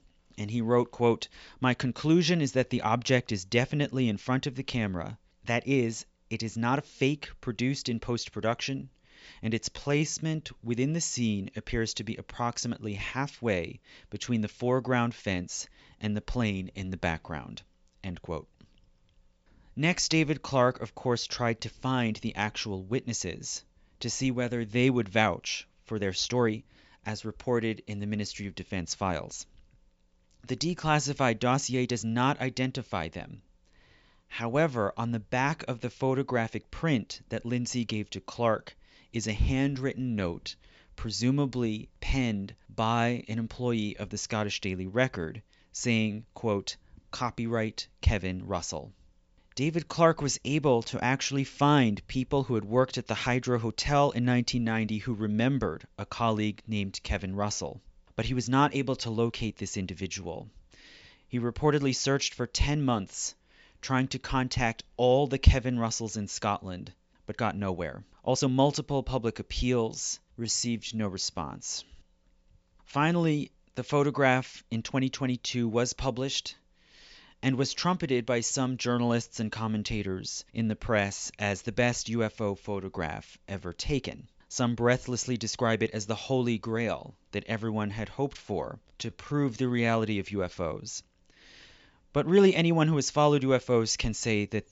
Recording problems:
high frequencies cut off; noticeable; nothing above 8 kHz
uneven, jittery; strongly; from 9.5 s to 1:30

